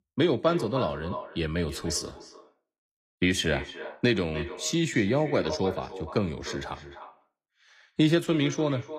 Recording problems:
echo of what is said; noticeable; throughout; 300 ms later, 10 dB below the speech

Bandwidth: 14.5 kHz